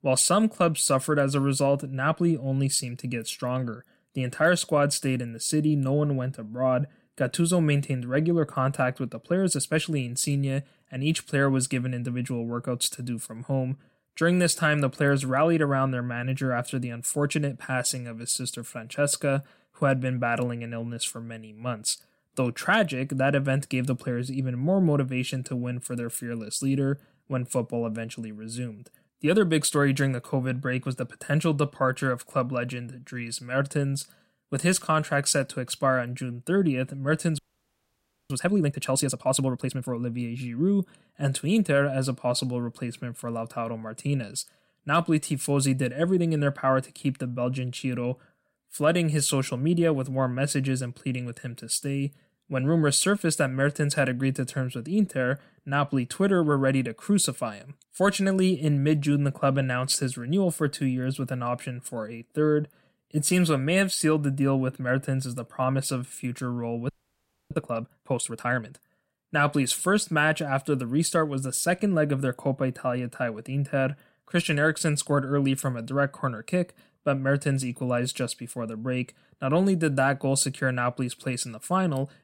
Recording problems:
audio freezing; at 37 s for 1 s and at 1:07 for 0.5 s

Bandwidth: 16 kHz